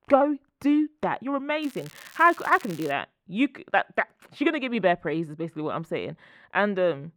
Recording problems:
muffled; slightly; fading above 3 kHz
crackling; faint; from 1.5 to 3 s; 20 dB below the speech

